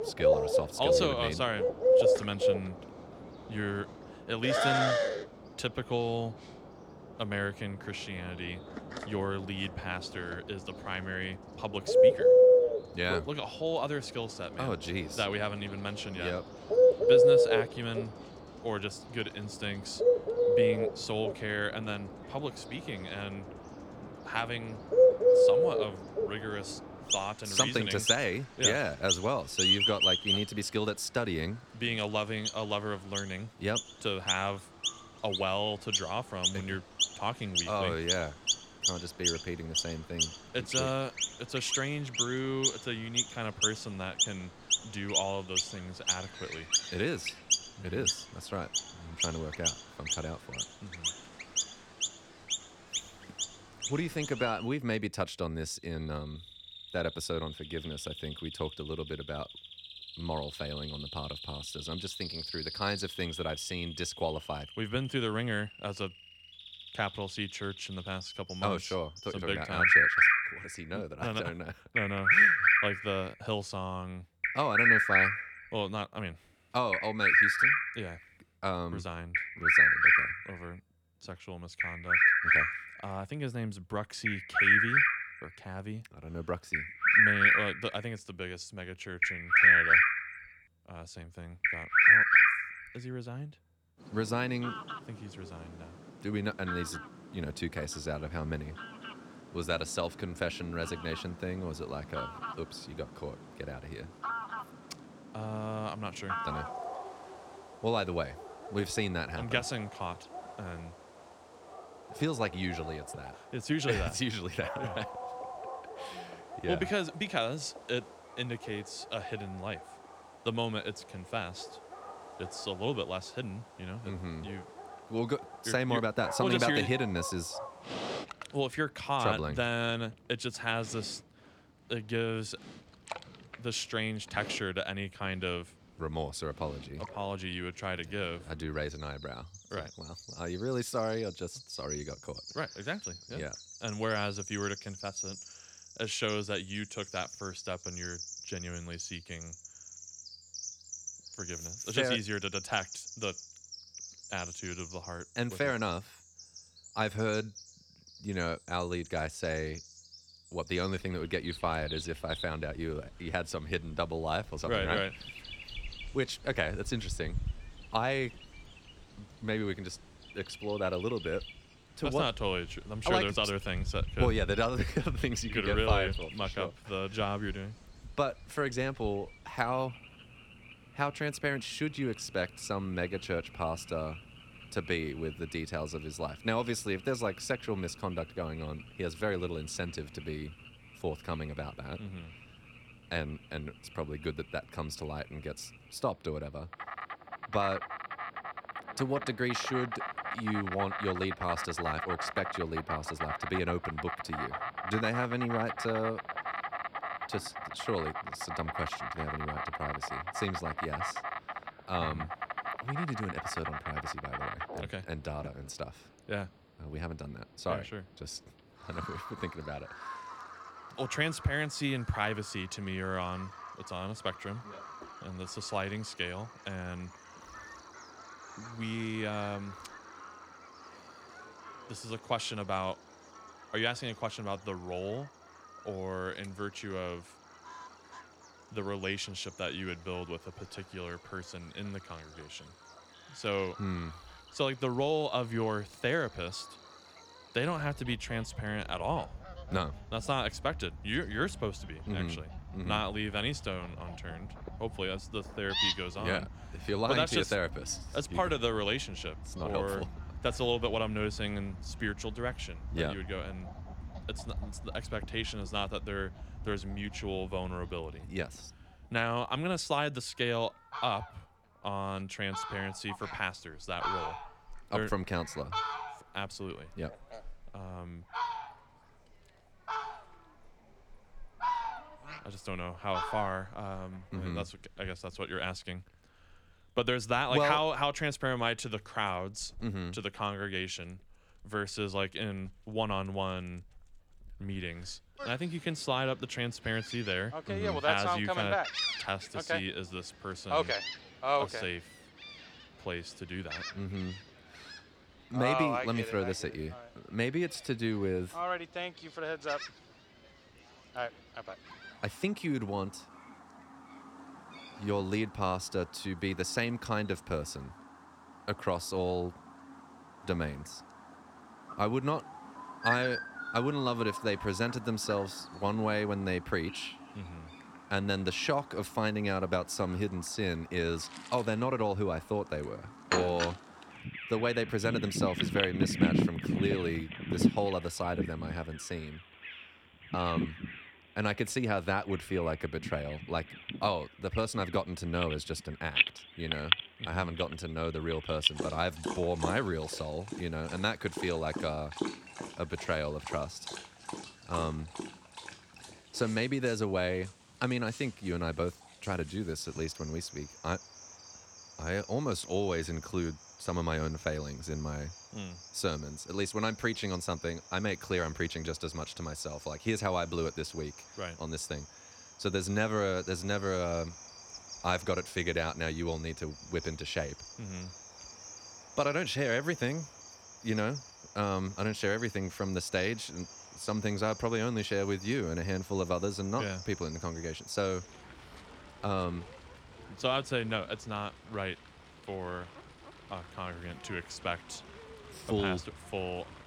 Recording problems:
animal sounds; very loud; throughout; 4 dB above the speech

